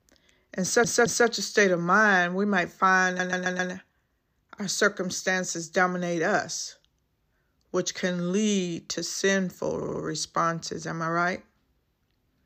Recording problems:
audio stuttering; at 0.5 s, at 3 s and at 10 s

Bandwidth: 15 kHz